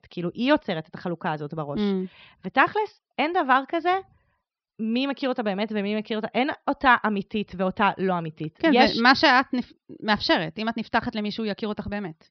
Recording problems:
high frequencies cut off; noticeable; nothing above 5.5 kHz

